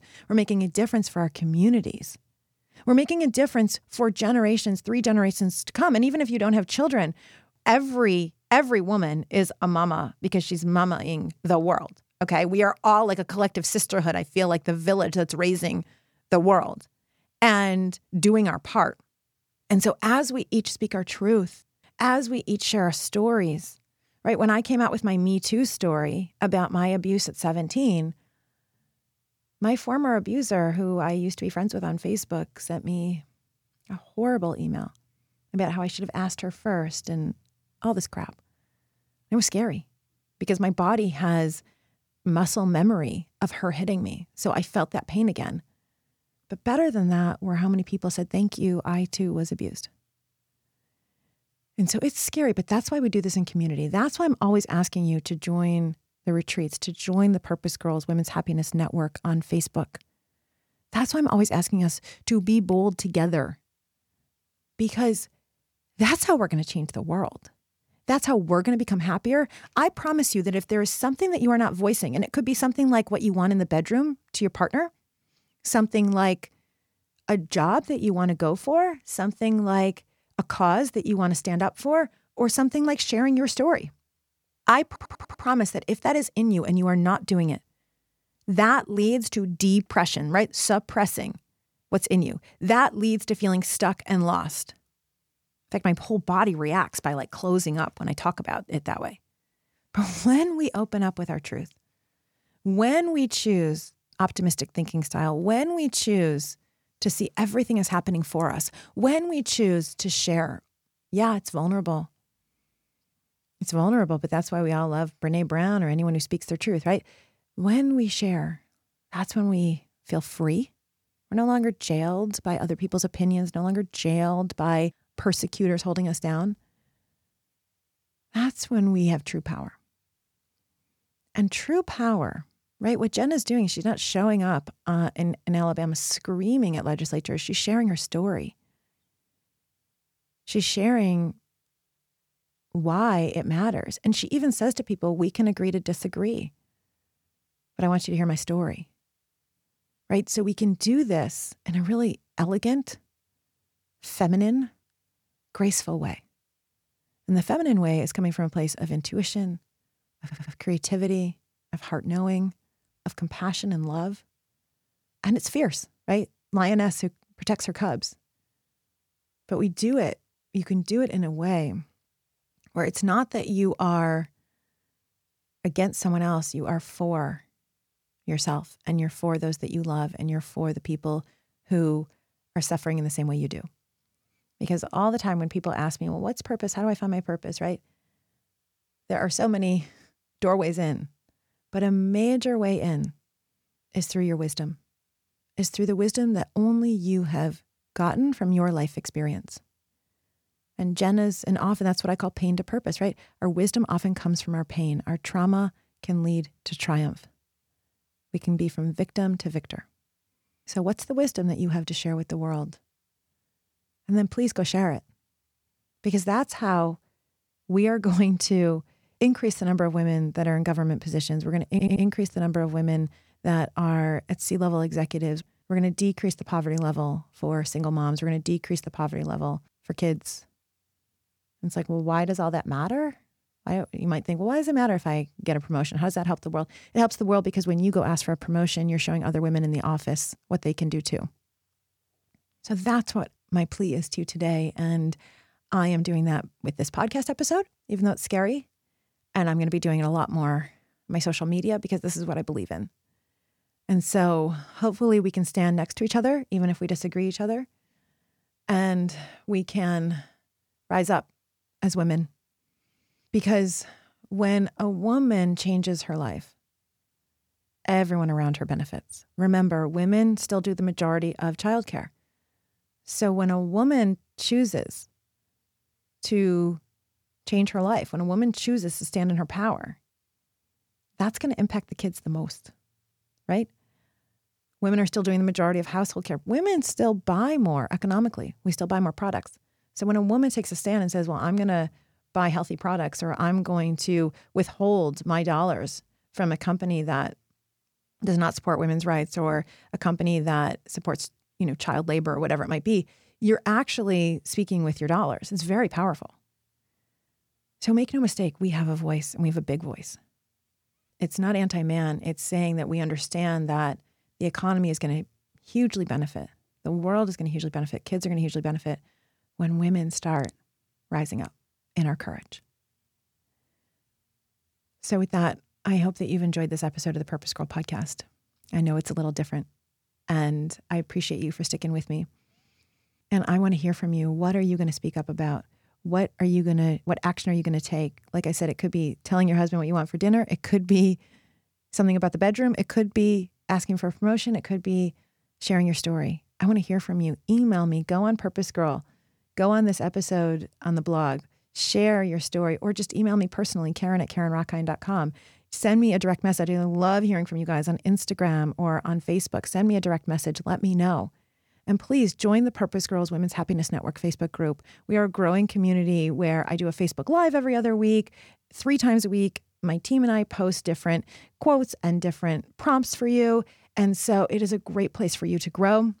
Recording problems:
audio stuttering; at 1:25, at 2:40 and at 3:42

